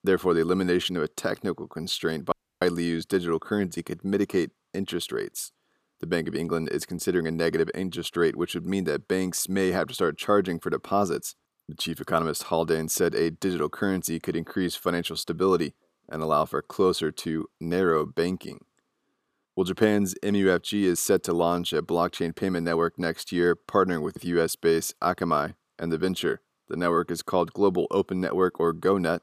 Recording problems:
audio cutting out; at 2.5 s

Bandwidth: 15 kHz